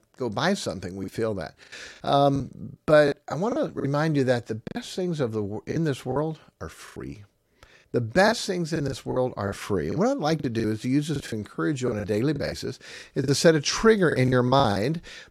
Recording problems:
choppy; very; 10% of the speech affected

